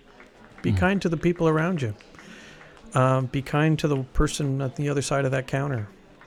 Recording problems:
murmuring crowd; faint; throughout; 25 dB below the speech

